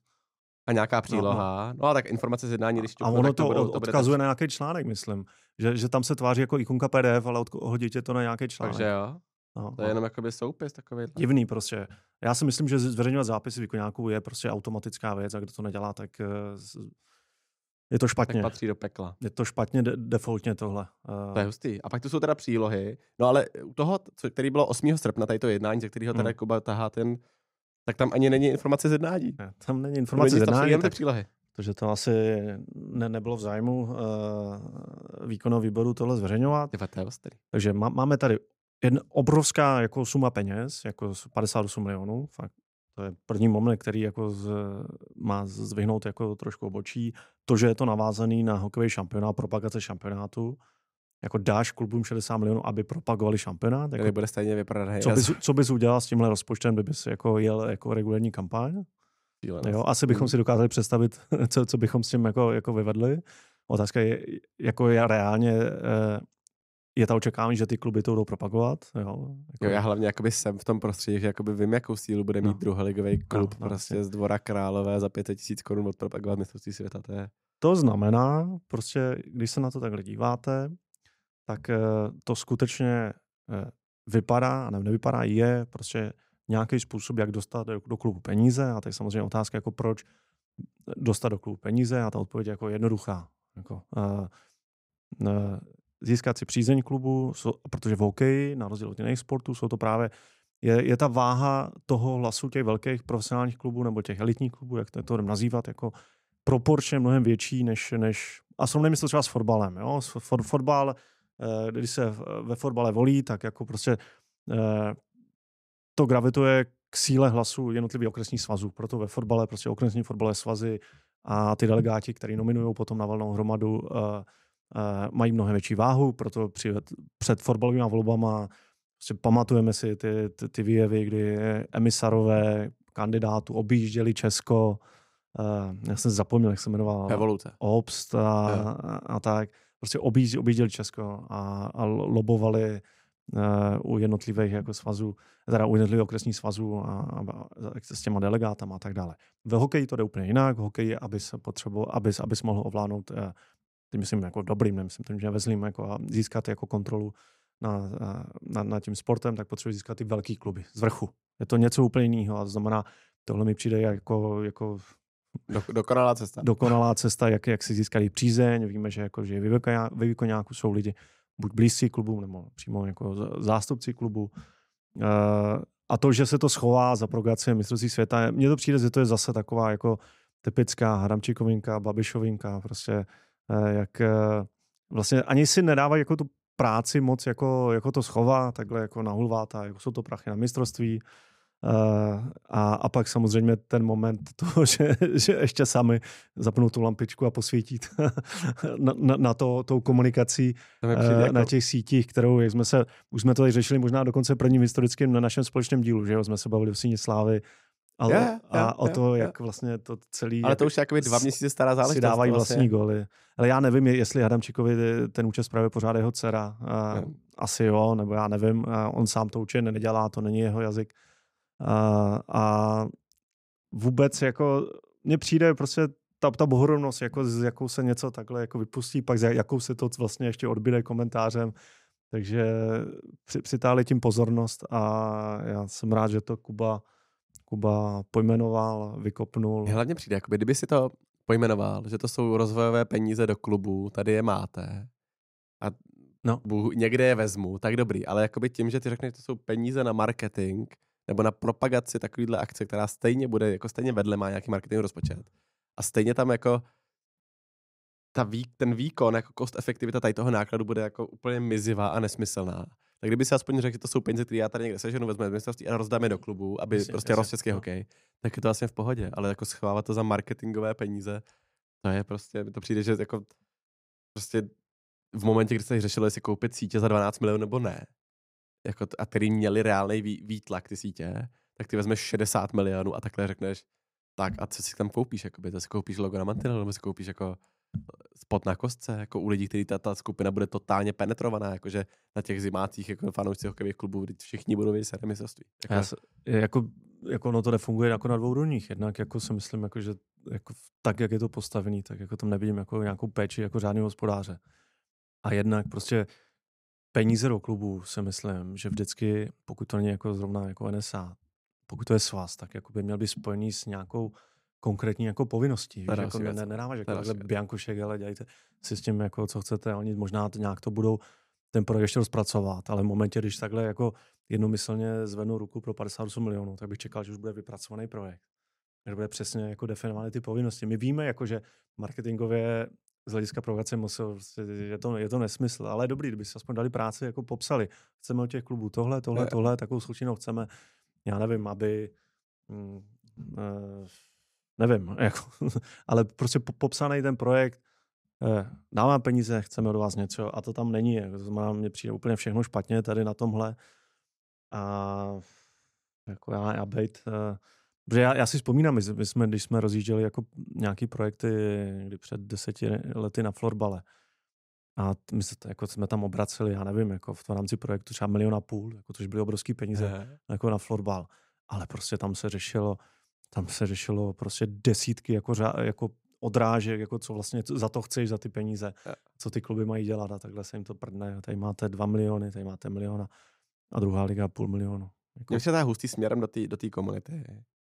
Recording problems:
none

